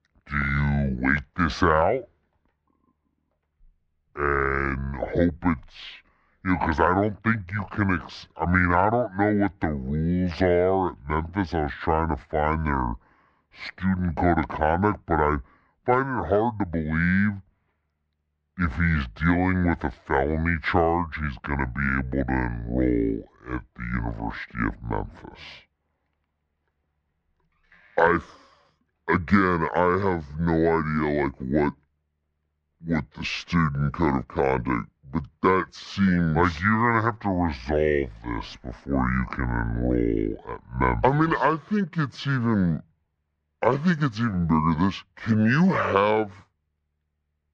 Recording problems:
wrong speed and pitch; too slow and too low; 0.6 times normal speed
muffled; slightly; fading above 2 kHz

